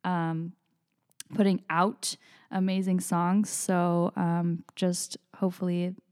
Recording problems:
none

